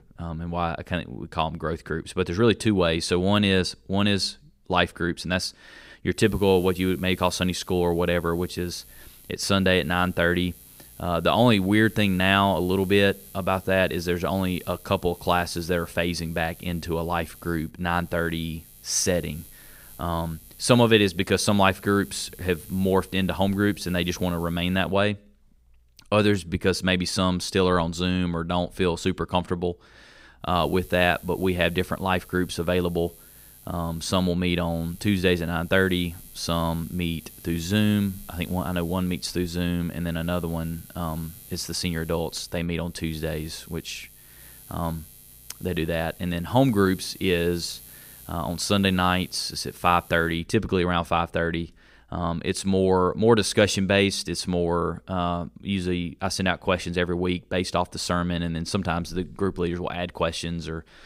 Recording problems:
electrical hum; faint; from 6 to 25 s and from 31 to 50 s; 60 Hz, 25 dB below the speech

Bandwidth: 15.5 kHz